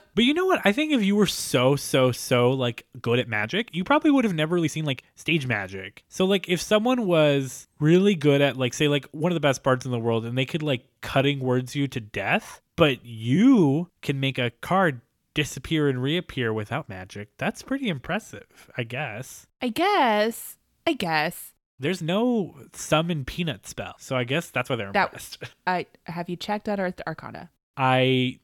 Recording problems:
uneven, jittery; strongly; from 3 to 28 s

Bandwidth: 17 kHz